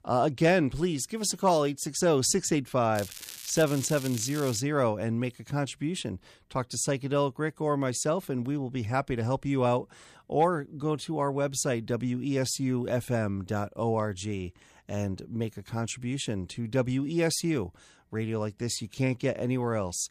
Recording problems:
crackling; noticeable; from 3 to 4.5 s; 10 dB below the speech

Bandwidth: 14.5 kHz